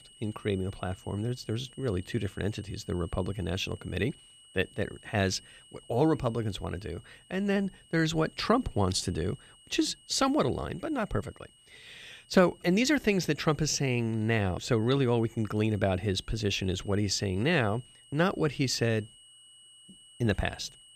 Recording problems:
high-pitched whine; faint; throughout; 3 kHz, 25 dB below the speech

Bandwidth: 15 kHz